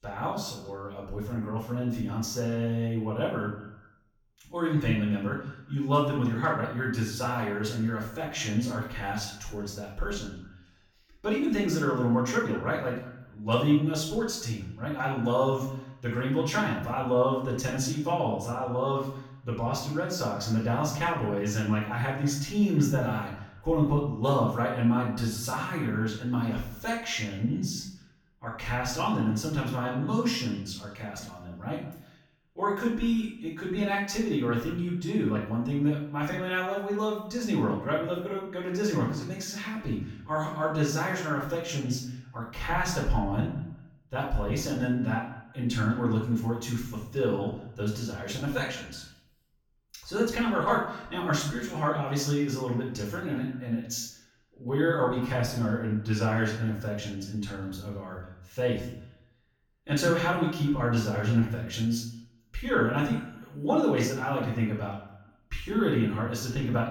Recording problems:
off-mic speech; far
room echo; noticeable; dies away in 0.5 s
echo of what is said; faint; throughout; 200 ms later, 20 dB below the speech

